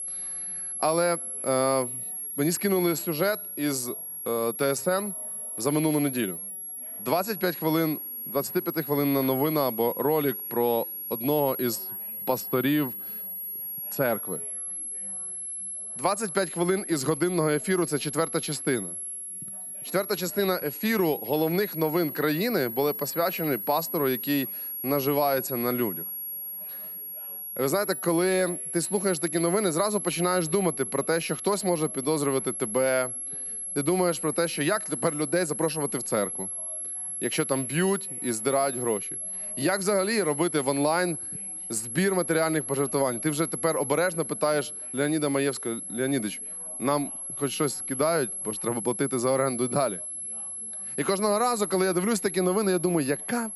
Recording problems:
high-pitched whine; loud; throughout; 11 kHz, 5 dB below the speech
background chatter; faint; throughout; 4 voices, 30 dB below the speech

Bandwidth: 14.5 kHz